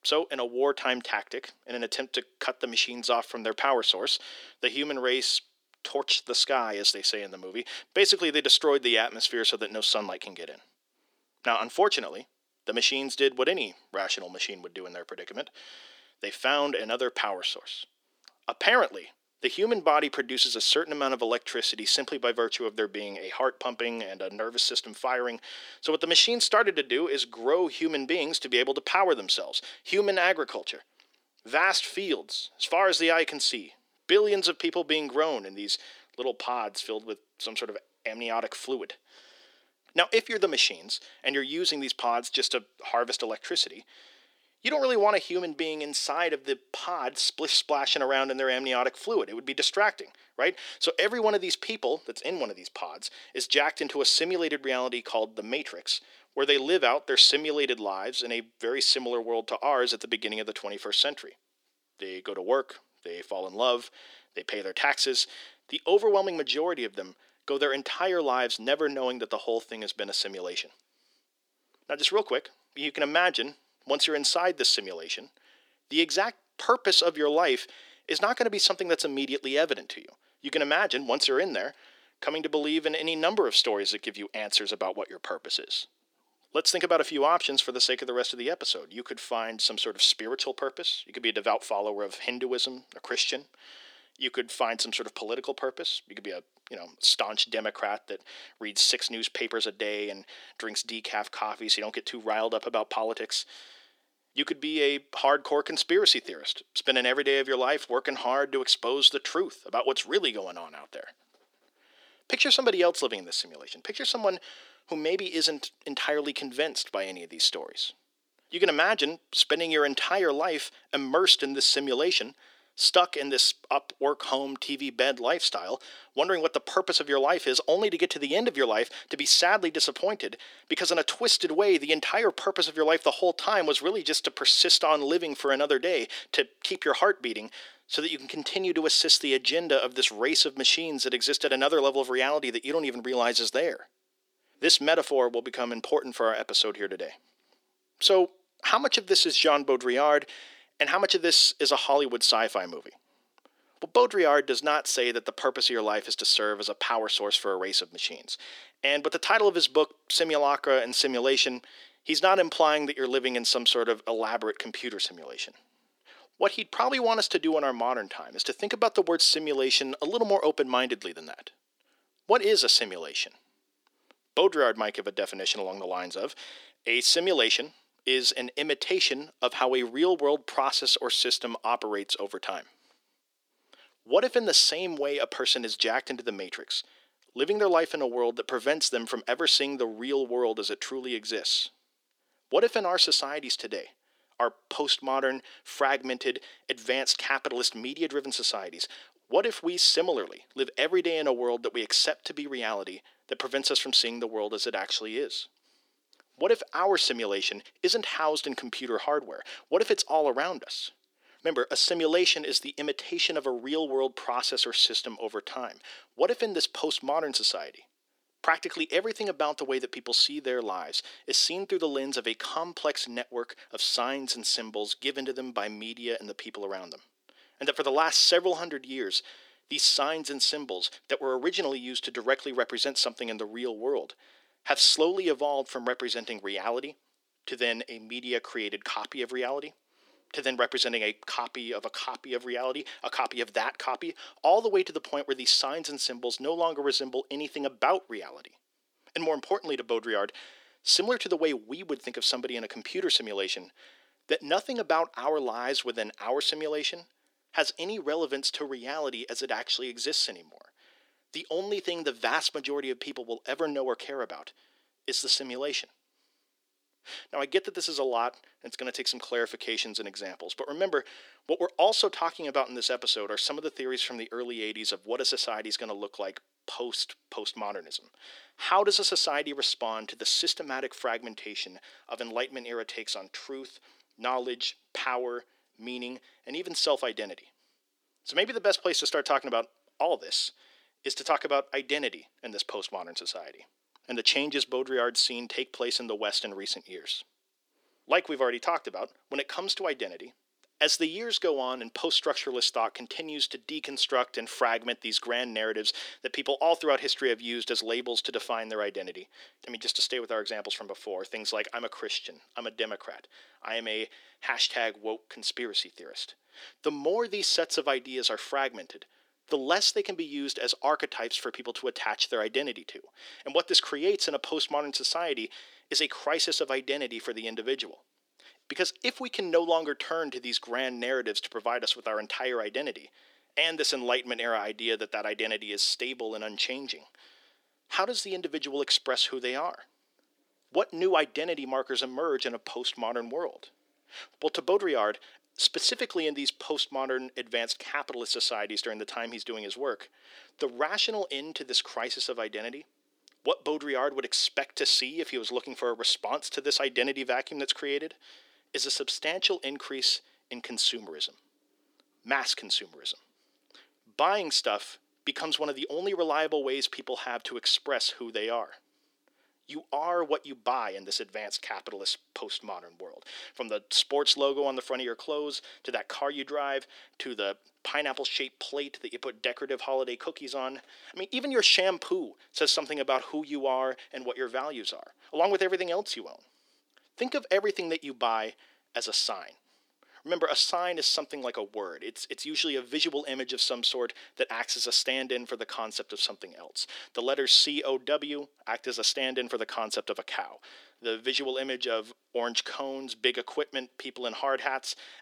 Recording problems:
thin; very; fading below 350 Hz

